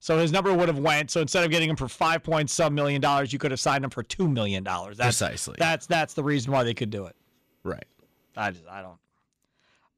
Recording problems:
distortion; slight; 6% of the sound clipped

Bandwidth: 14.5 kHz